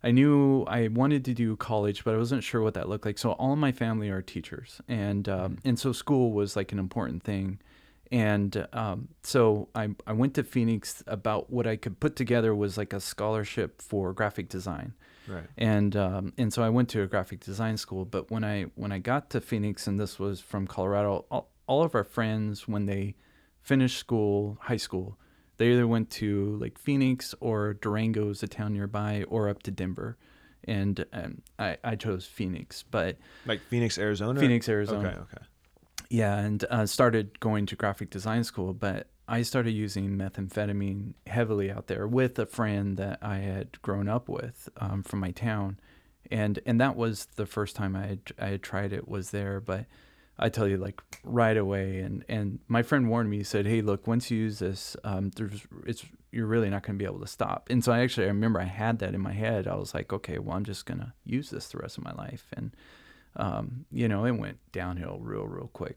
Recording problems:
none

